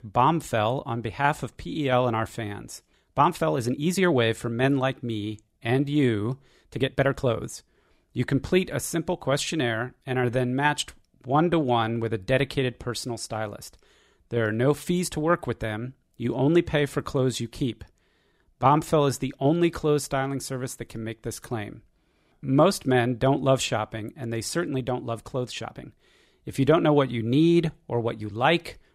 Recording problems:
uneven, jittery; strongly; from 3 to 26 s

